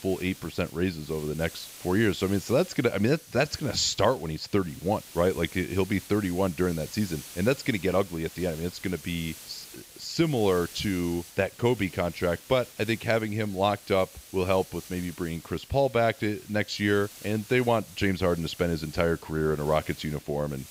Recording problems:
high frequencies cut off; noticeable; nothing above 7.5 kHz
hiss; noticeable; throughout; 15 dB below the speech

